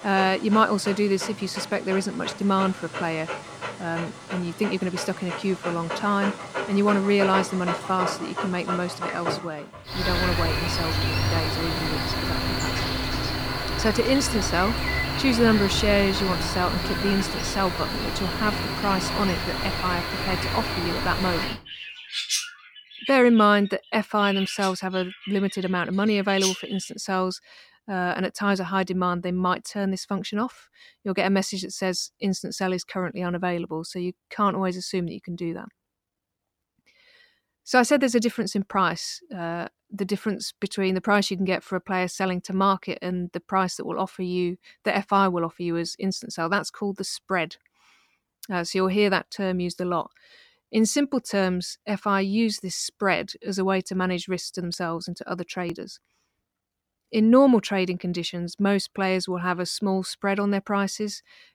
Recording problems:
animal sounds; loud; until 27 s; 3 dB below the speech

